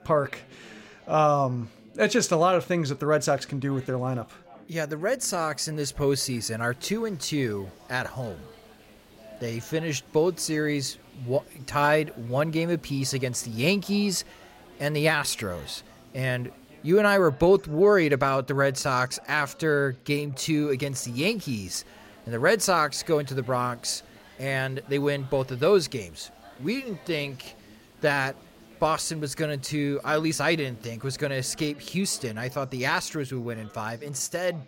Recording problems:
background chatter; faint; throughout; 4 voices, 25 dB below the speech
hiss; faint; from 6.5 to 17 s and from 21 to 31 s; 30 dB below the speech

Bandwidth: 16 kHz